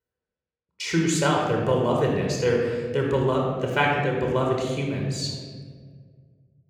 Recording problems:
room echo; noticeable; dies away in 1.5 s
off-mic speech; somewhat distant

